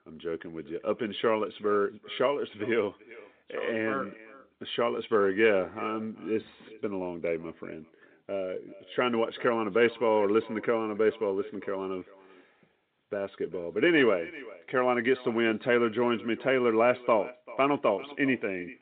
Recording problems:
echo of what is said; faint; throughout; 390 ms later, 20 dB below the speech
phone-call audio

